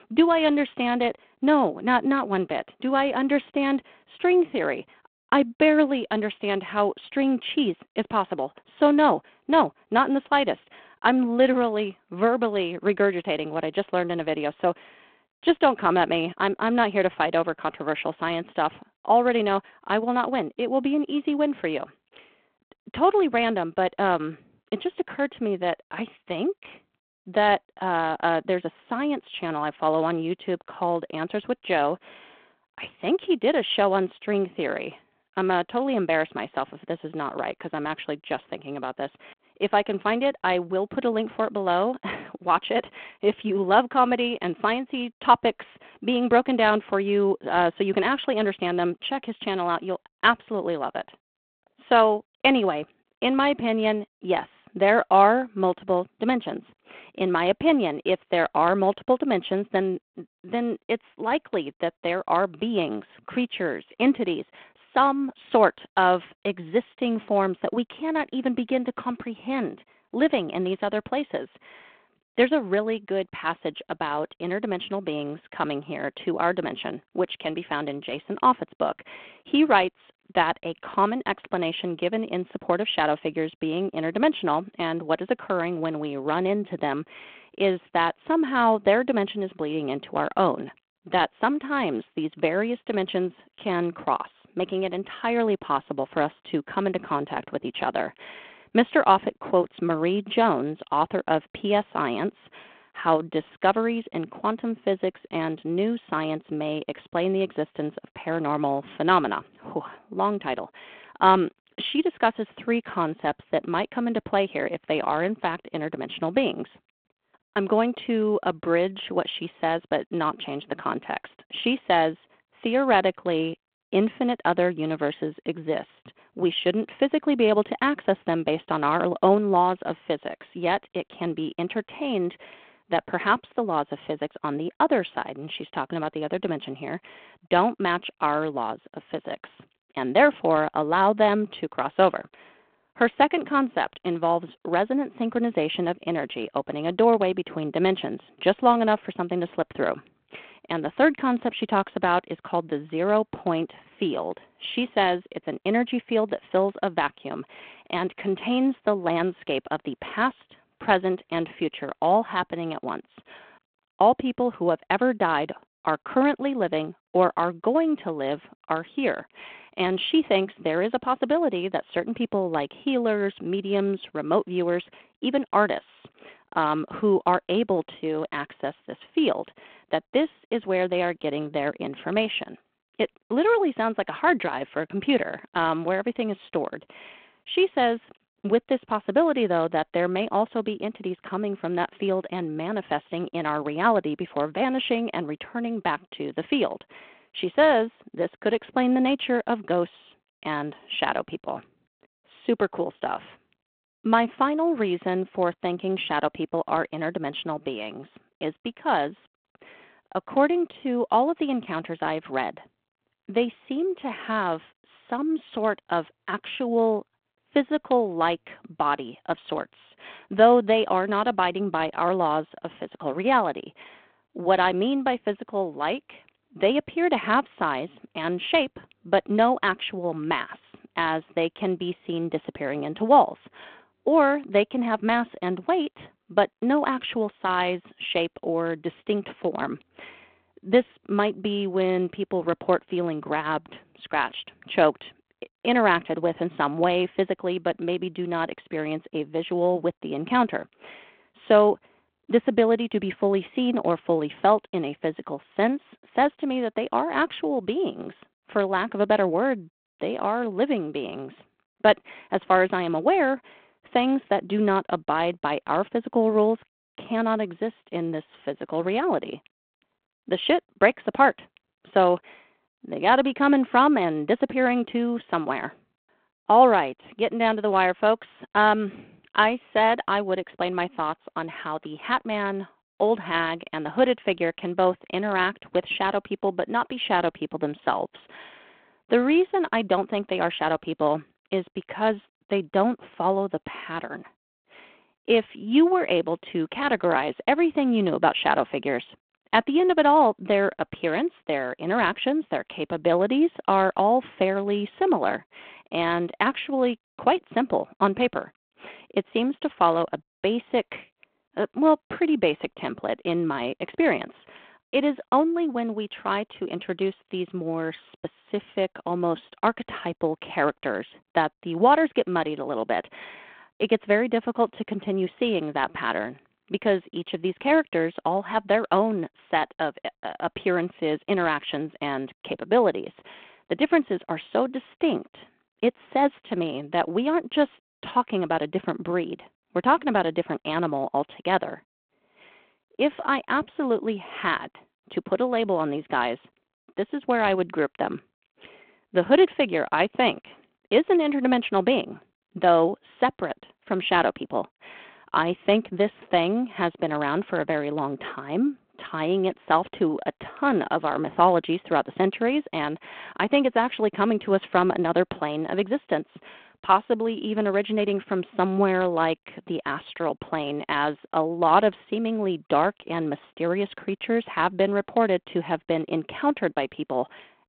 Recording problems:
phone-call audio

